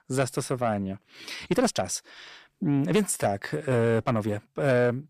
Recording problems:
distortion; slight; 10 dB below the speech
uneven, jittery; strongly; from 0.5 to 4.5 s

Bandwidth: 14.5 kHz